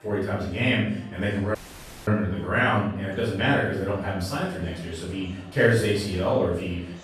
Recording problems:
off-mic speech; far
room echo; noticeable; dies away in 0.6 s
murmuring crowd; faint; throughout; 20 dB below the speech
audio cutting out; at 1.5 s for 0.5 s

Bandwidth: 13.5 kHz